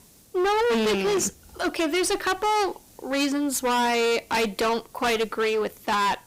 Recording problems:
distortion; heavy; 27% of the sound clipped
hiss; faint; throughout; 30 dB below the speech

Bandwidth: 15.5 kHz